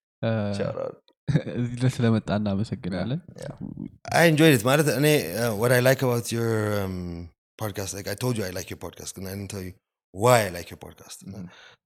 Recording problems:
none

